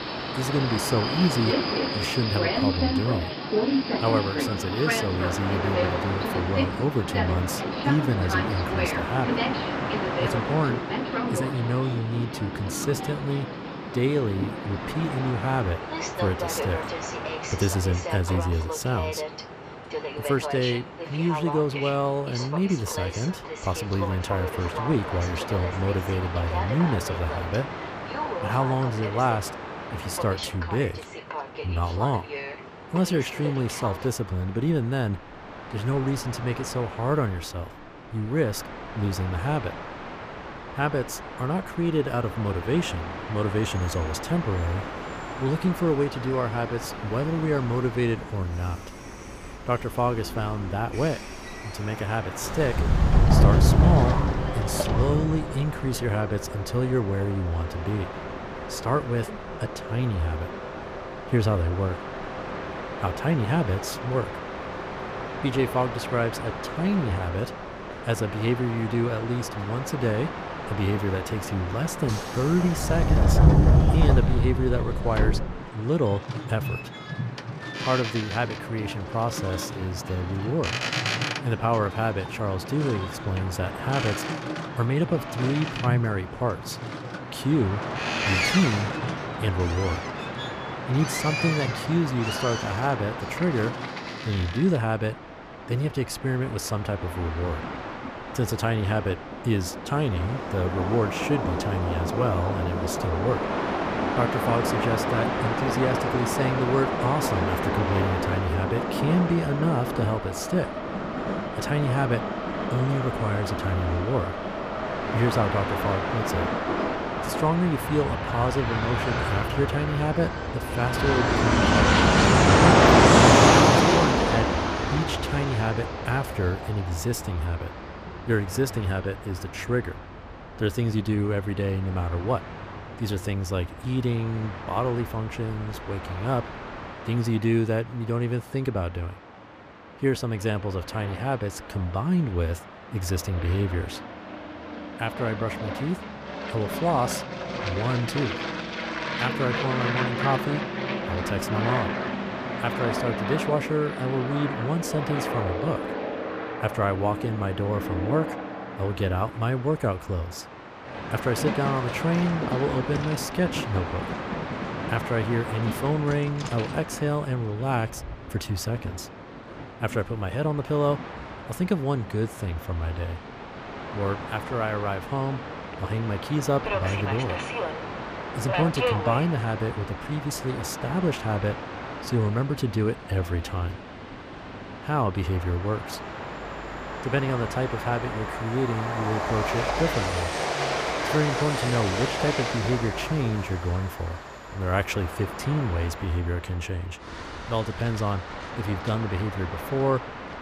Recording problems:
train or aircraft noise; loud; throughout; 1 dB below the speech

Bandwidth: 15 kHz